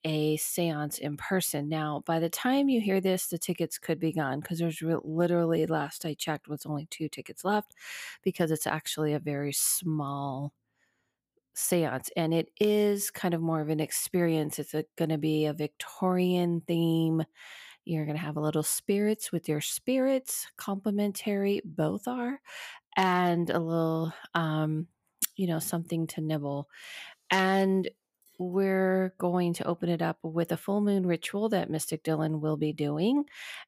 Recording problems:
none

